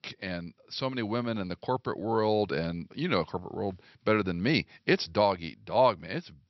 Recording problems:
high frequencies cut off; noticeable; nothing above 5.5 kHz

